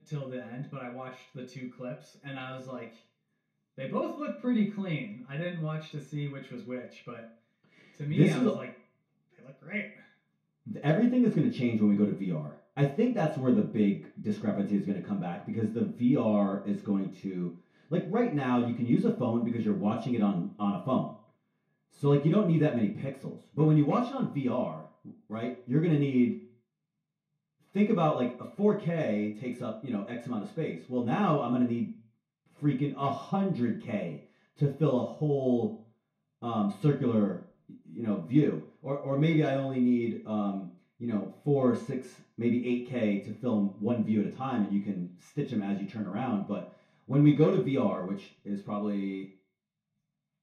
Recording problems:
off-mic speech; far
room echo; slight; dies away in 0.4 s

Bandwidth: 14.5 kHz